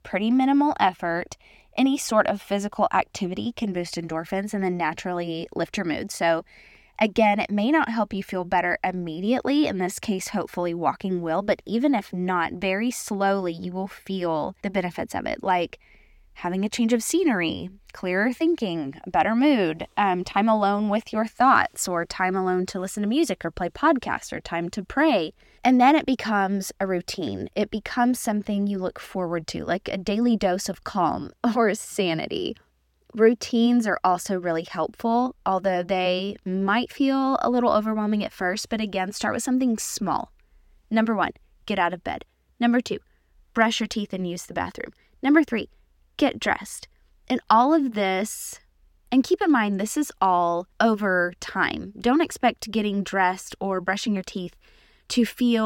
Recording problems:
abrupt cut into speech; at the end

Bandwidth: 17 kHz